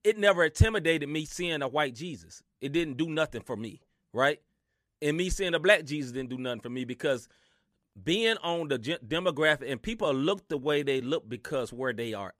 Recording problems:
uneven, jittery; slightly; from 2.5 to 12 s

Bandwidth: 14.5 kHz